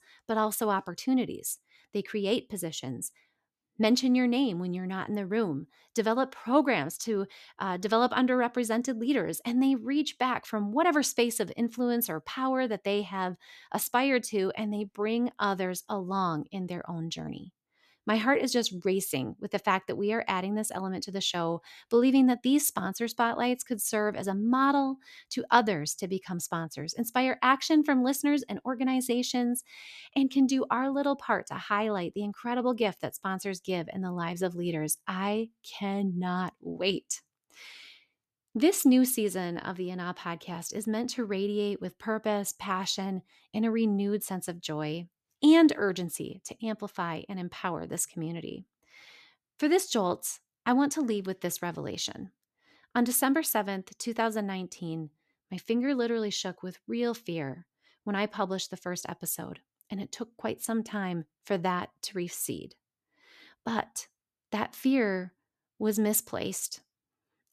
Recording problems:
none

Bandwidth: 14 kHz